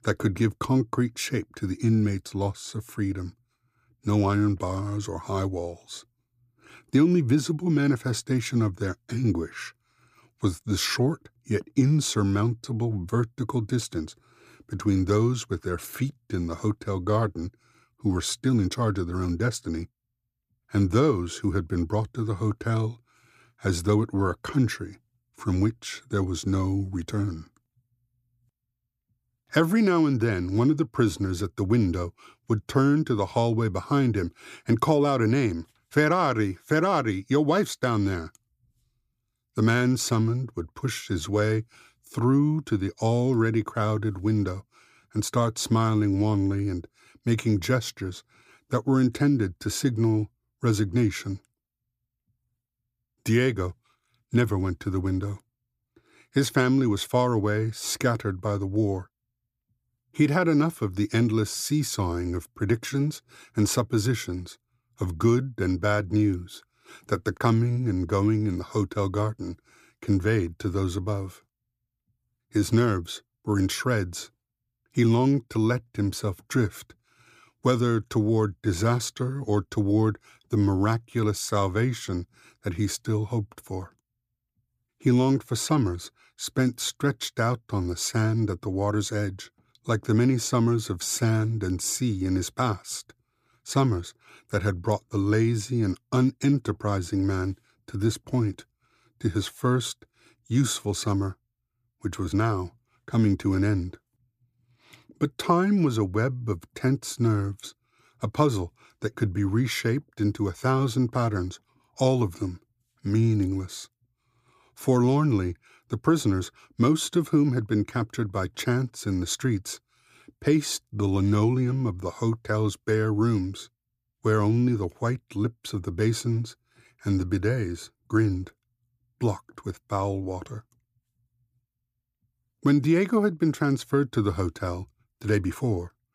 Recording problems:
none

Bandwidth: 15 kHz